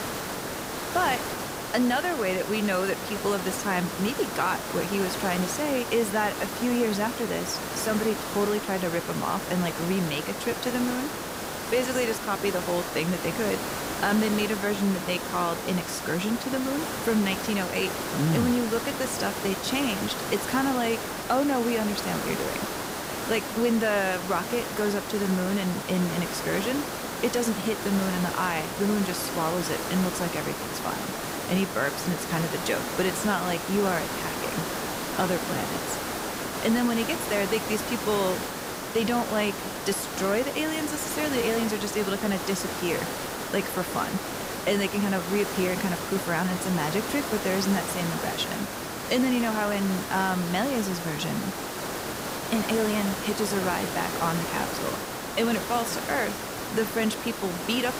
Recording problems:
hiss; loud; throughout; 4 dB below the speech

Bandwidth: 15.5 kHz